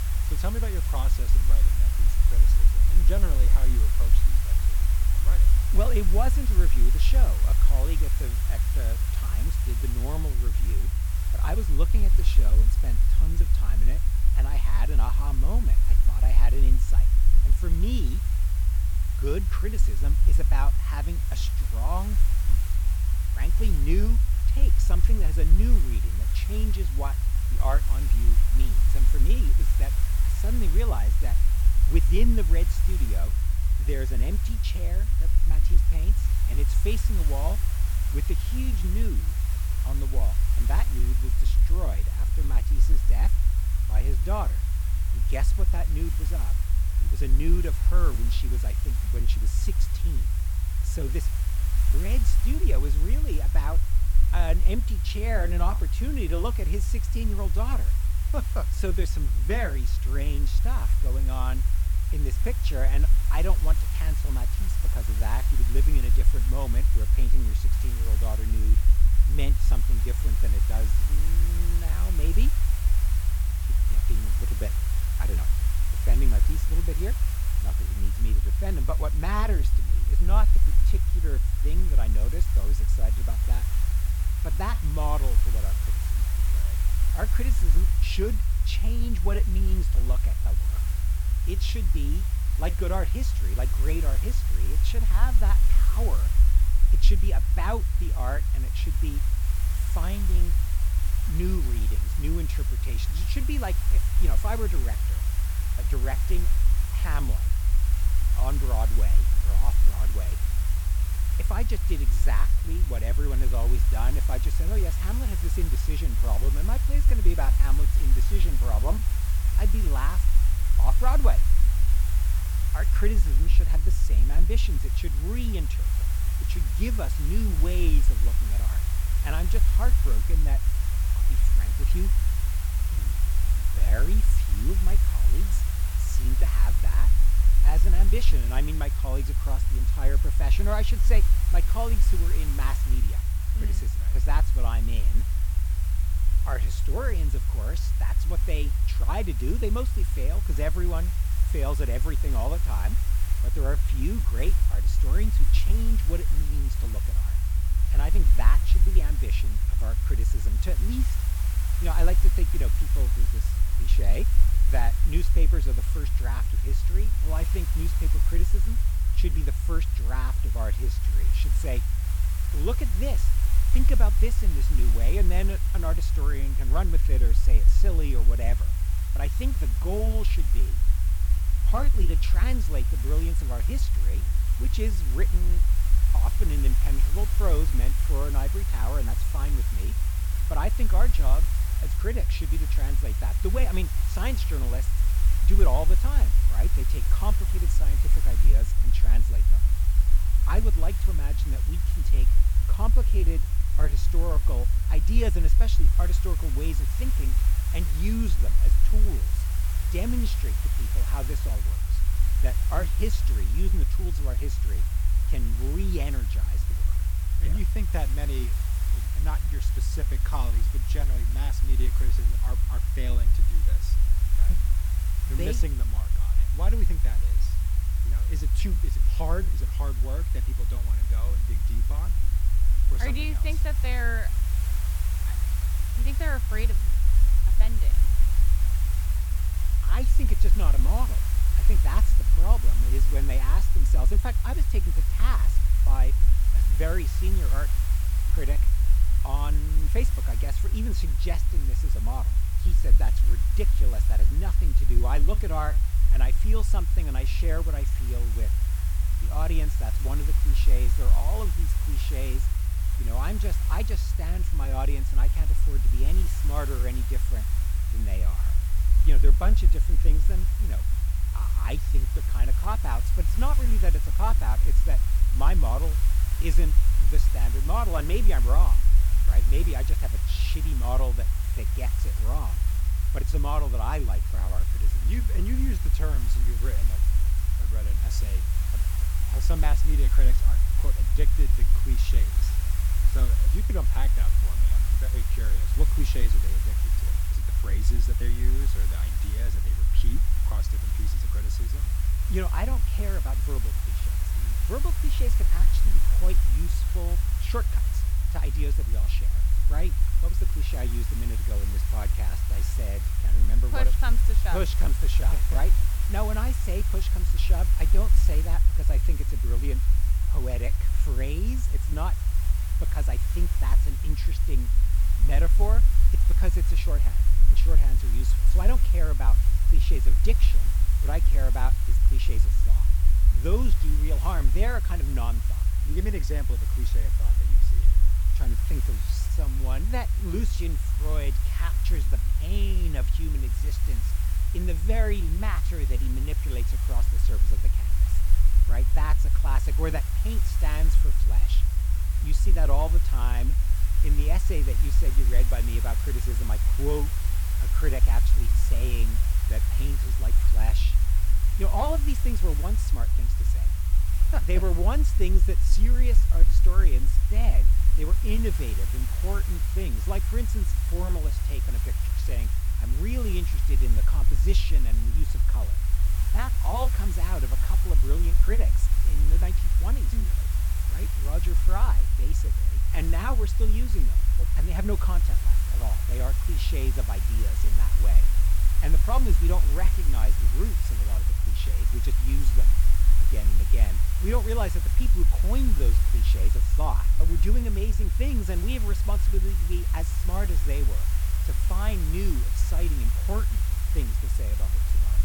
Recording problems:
hiss; loud; throughout; 5 dB below the speech
low rumble; loud; throughout; 9 dB below the speech

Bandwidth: 18 kHz